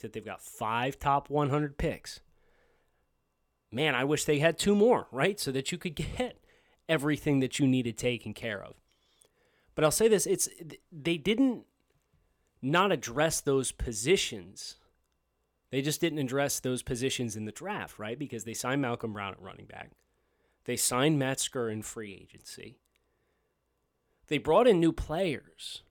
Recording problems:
none

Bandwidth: 17 kHz